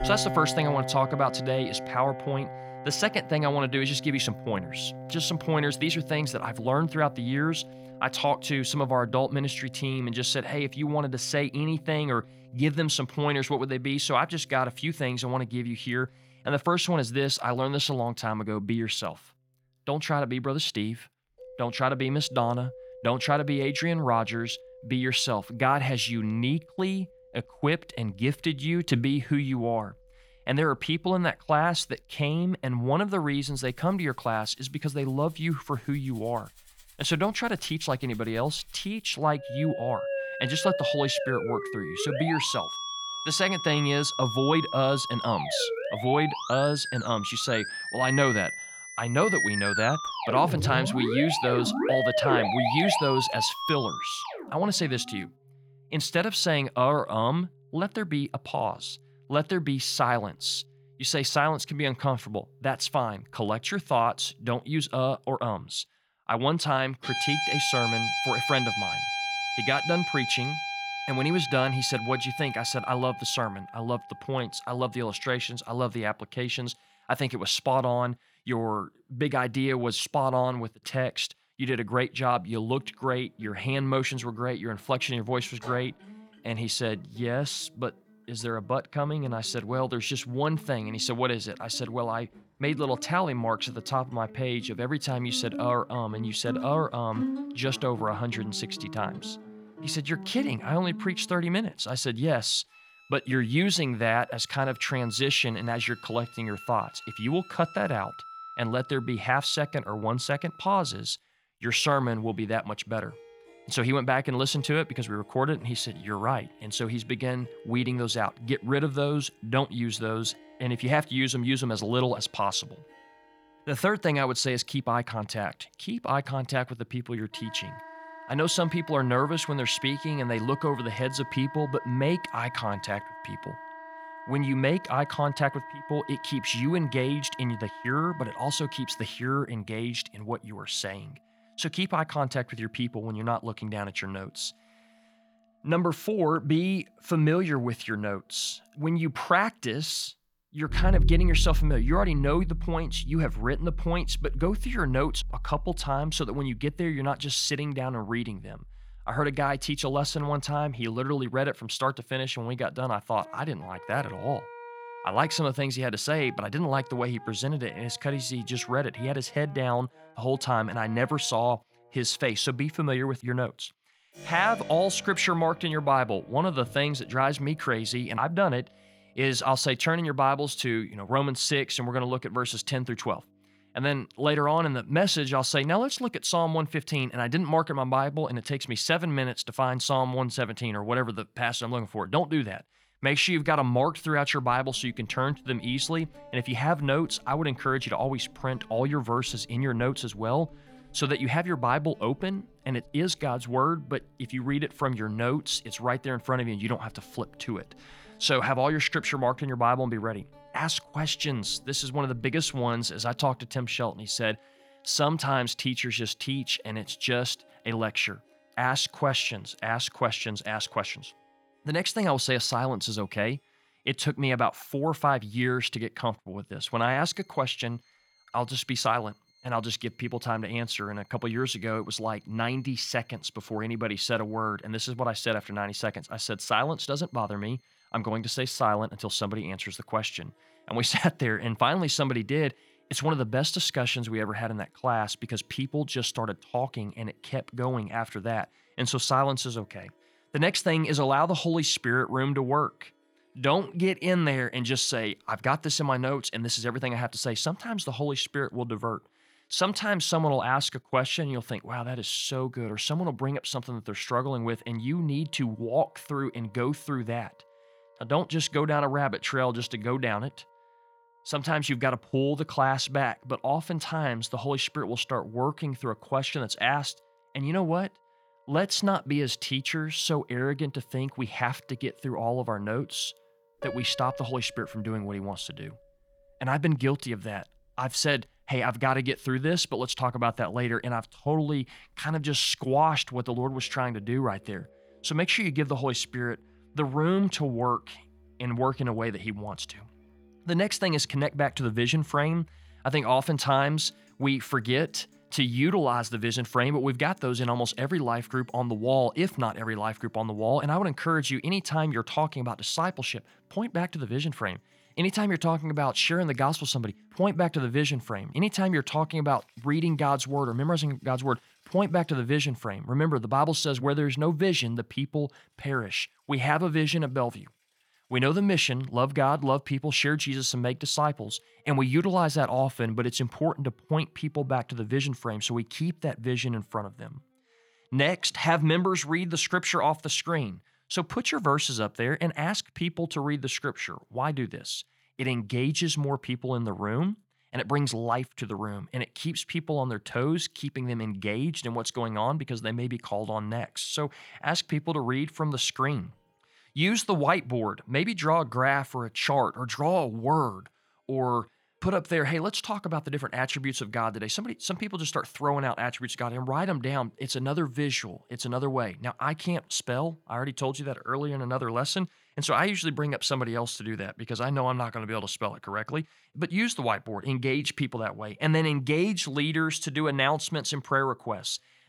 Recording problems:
background music; loud; throughout; 7 dB below the speech

